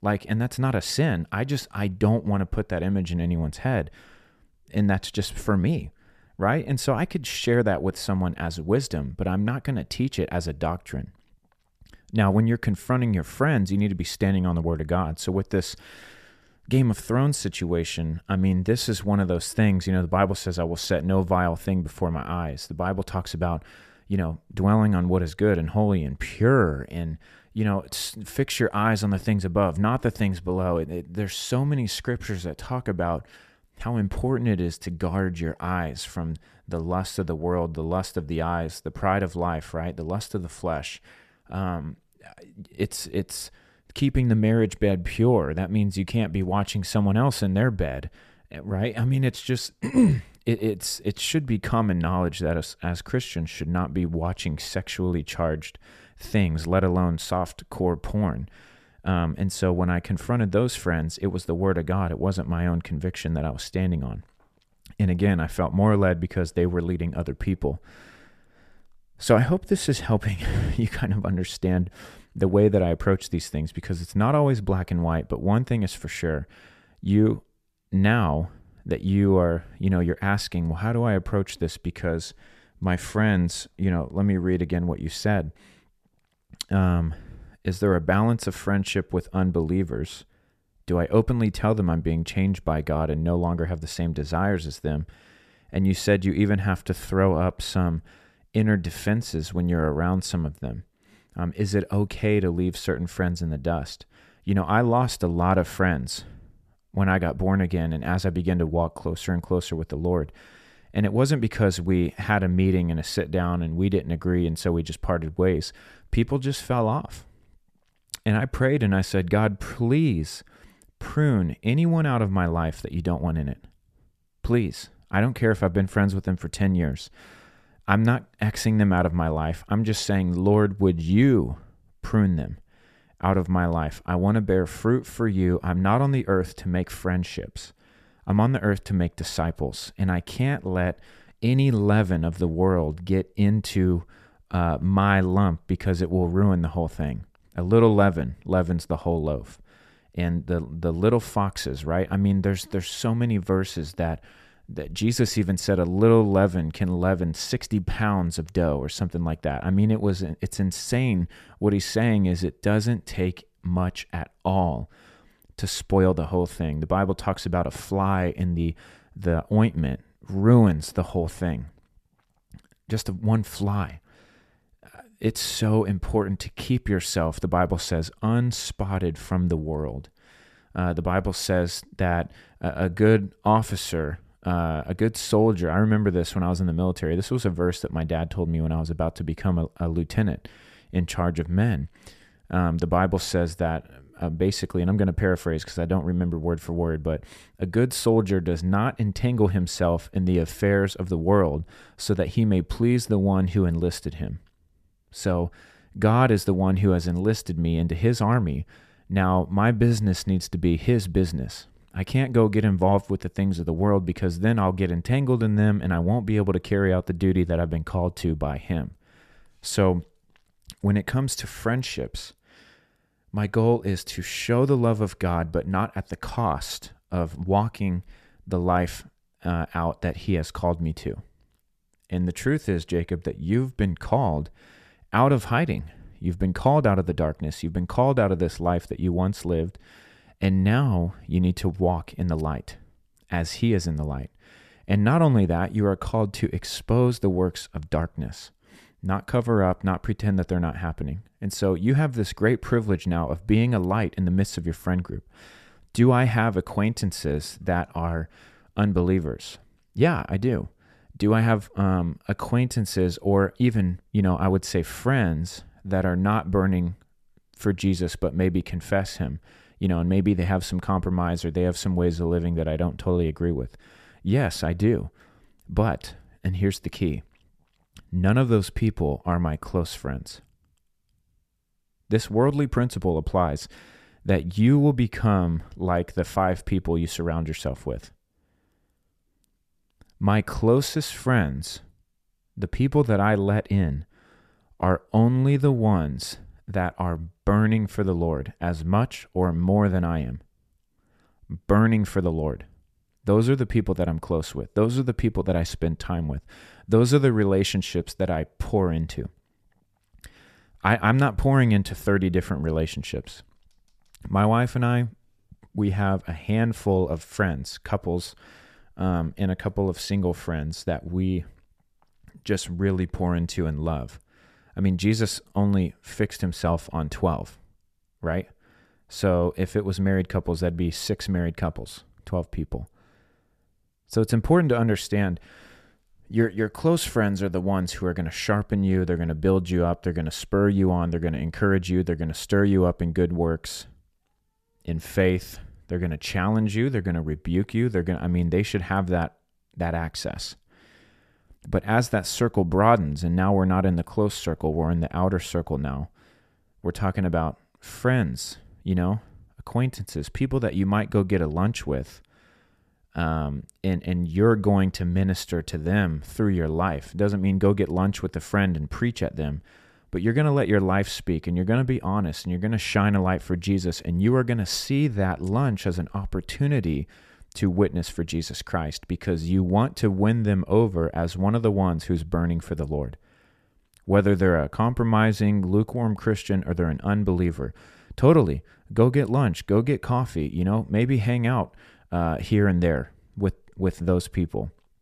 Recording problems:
none

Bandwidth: 14.5 kHz